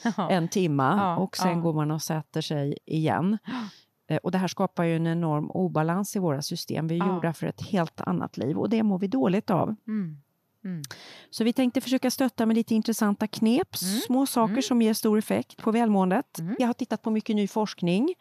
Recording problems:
uneven, jittery; strongly; from 1.5 to 17 s

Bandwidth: 14.5 kHz